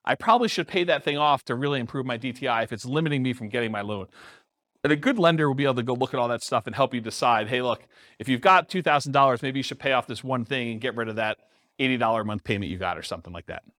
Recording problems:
none

